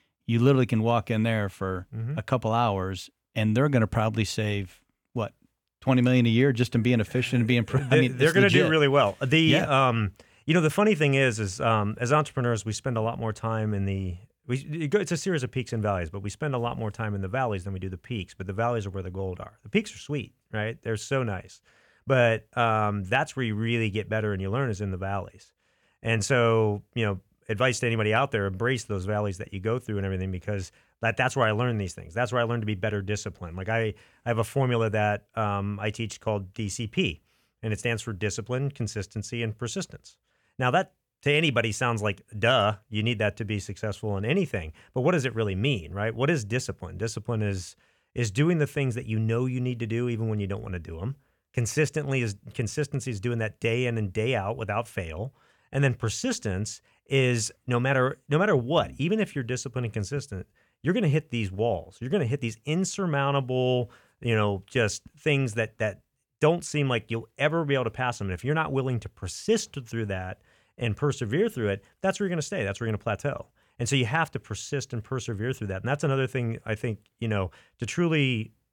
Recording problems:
none

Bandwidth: 18.5 kHz